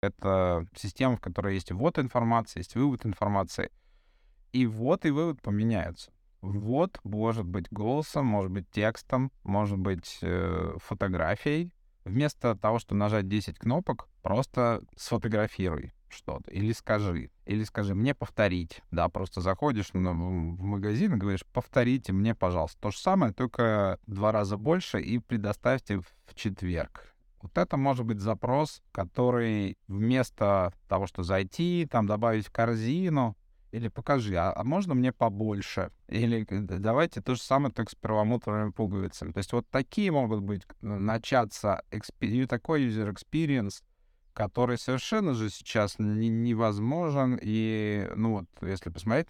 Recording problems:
none

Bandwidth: 17.5 kHz